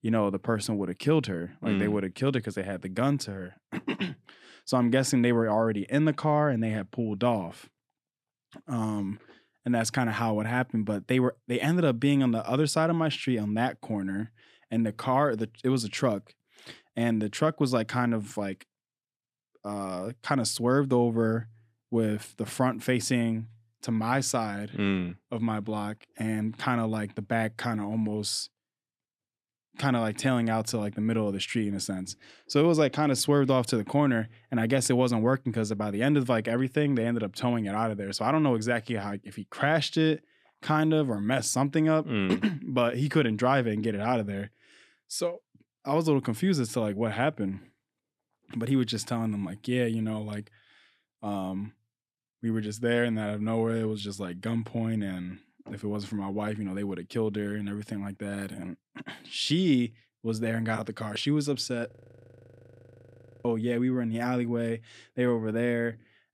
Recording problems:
audio freezing; at 1:02 for 1.5 s

